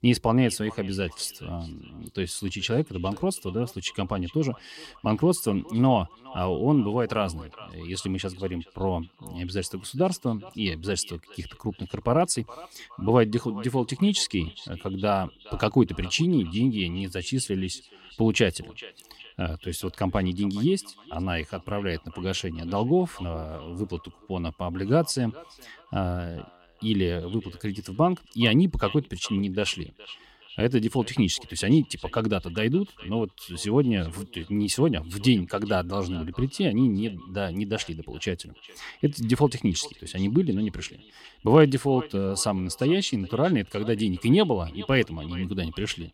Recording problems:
echo of what is said; faint; throughout; 420 ms later, 20 dB below the speech

